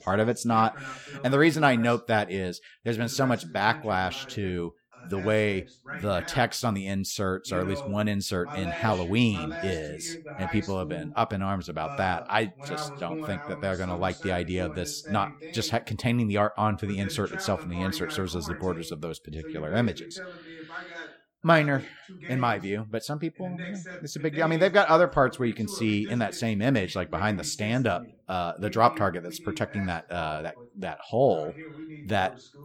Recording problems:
voice in the background; noticeable; throughout; 15 dB below the speech

